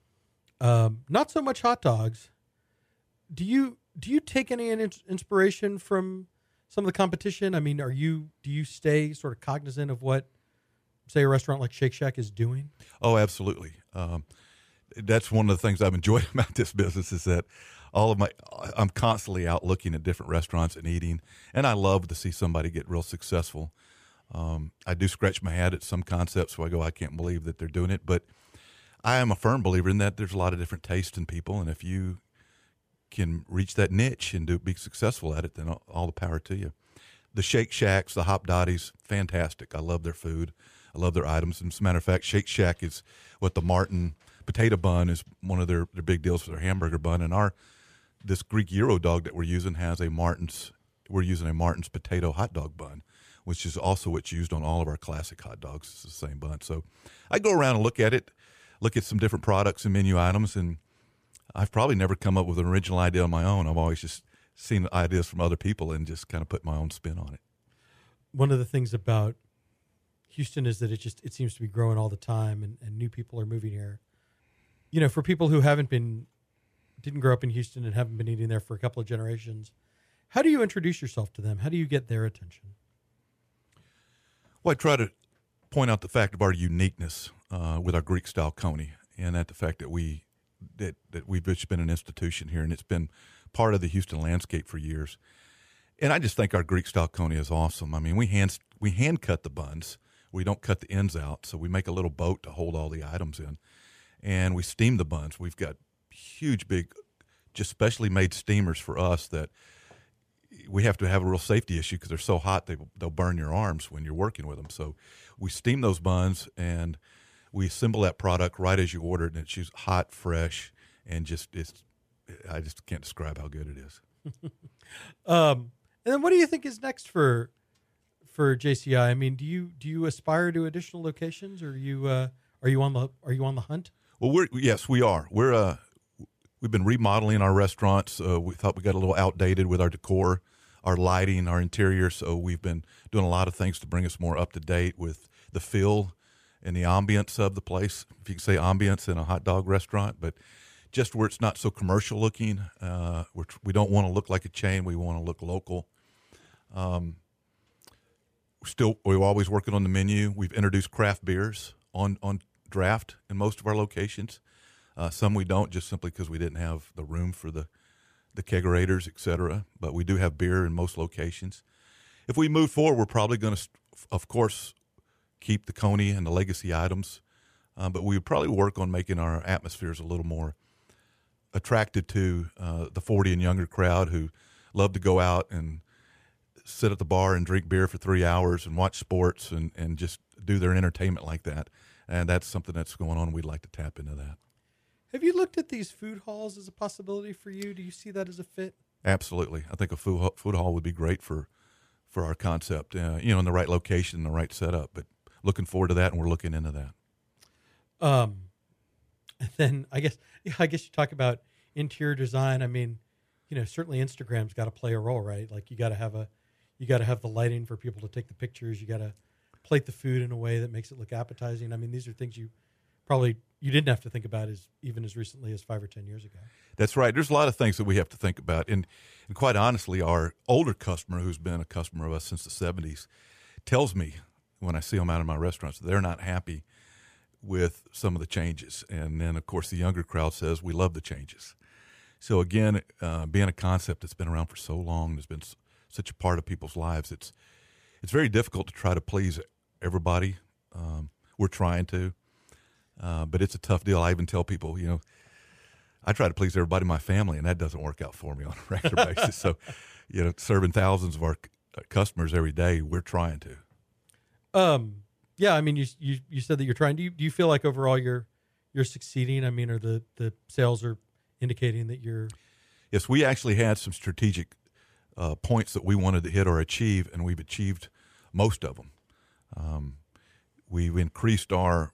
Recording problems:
none

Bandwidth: 14.5 kHz